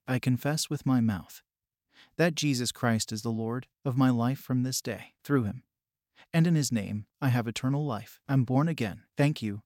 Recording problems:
none

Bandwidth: 16.5 kHz